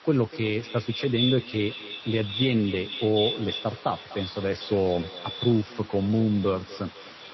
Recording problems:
echo of what is said; strong; throughout; 250 ms later, 6 dB below the speech
garbled, watery; slightly; nothing above 5.5 kHz
hiss; noticeable; throughout; 20 dB below the speech

